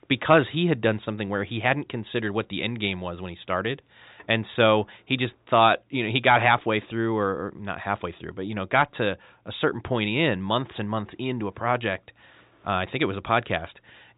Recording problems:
high frequencies cut off; severe; nothing above 4 kHz

